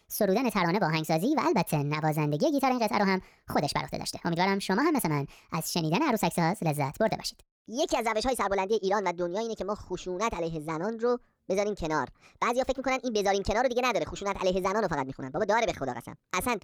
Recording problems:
wrong speed and pitch; too fast and too high; 1.5 times normal speed

